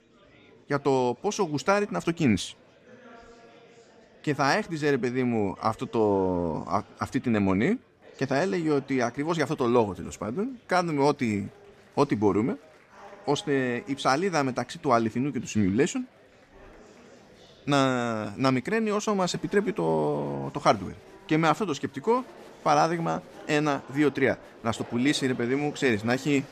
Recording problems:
murmuring crowd; faint; throughout; 25 dB below the speech

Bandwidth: 14.5 kHz